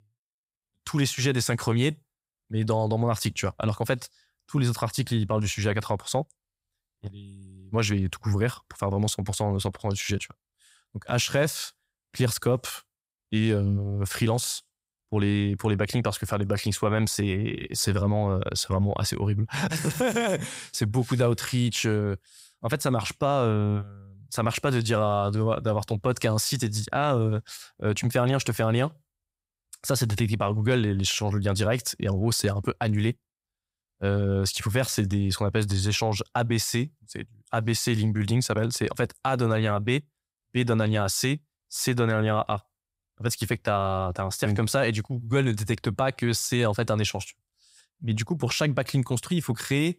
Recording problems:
none

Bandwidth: 15.5 kHz